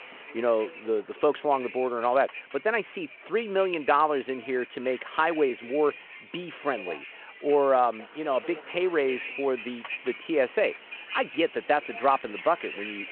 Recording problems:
phone-call audio
traffic noise; noticeable; throughout; 15 dB below the speech

